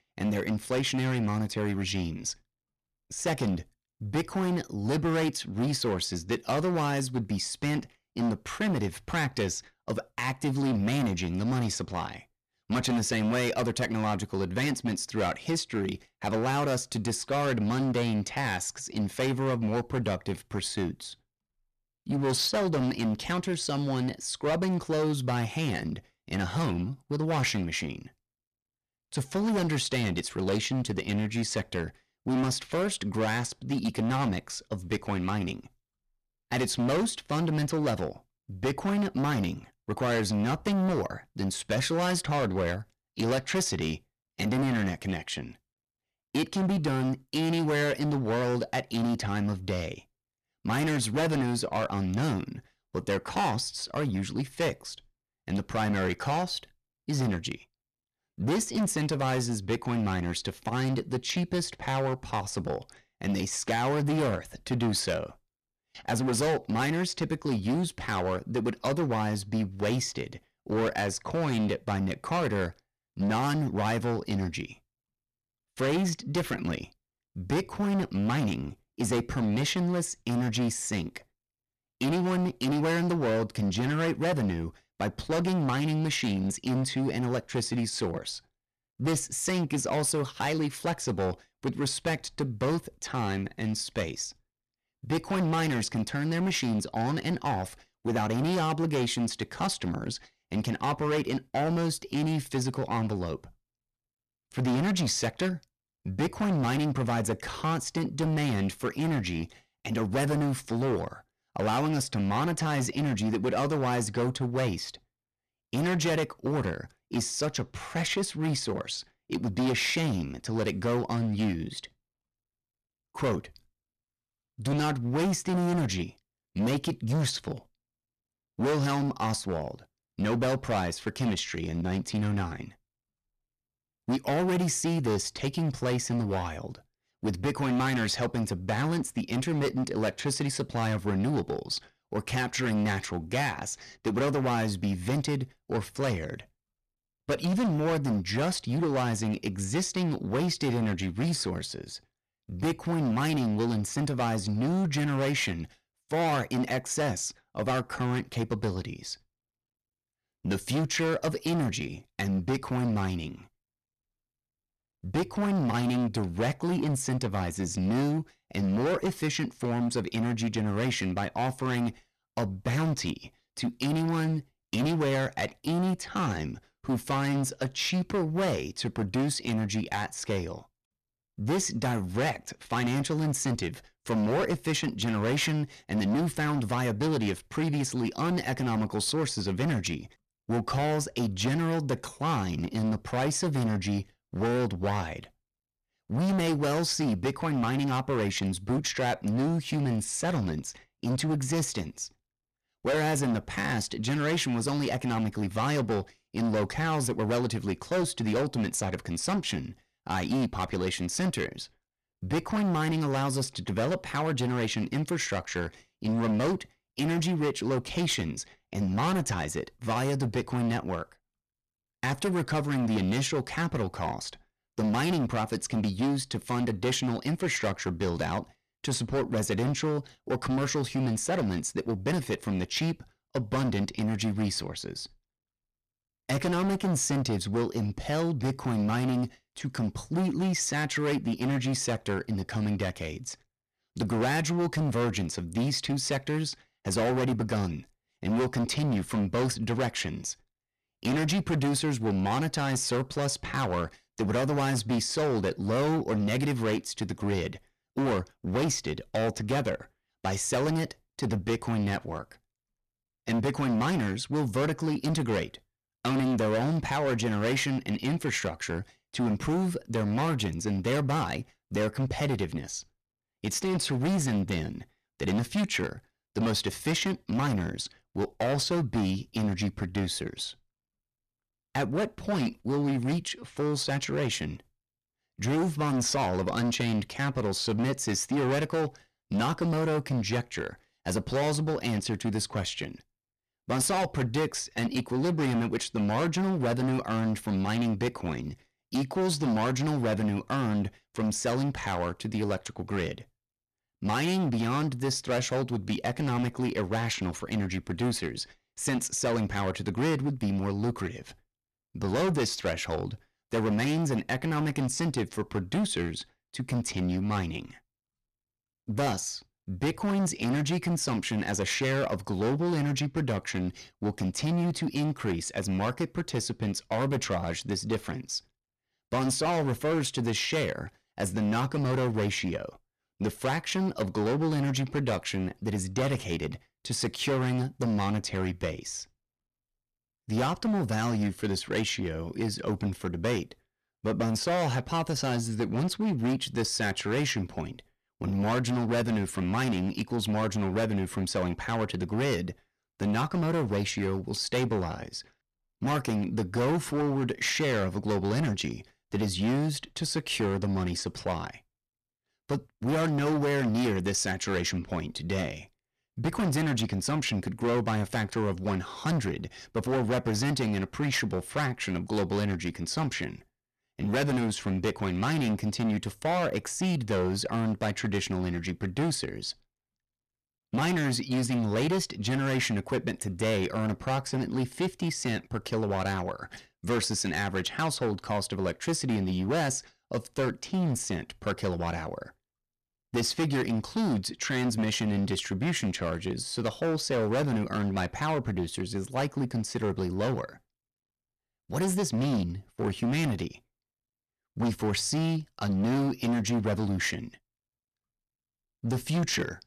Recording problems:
distortion; heavy; 16% of the sound clipped

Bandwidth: 14 kHz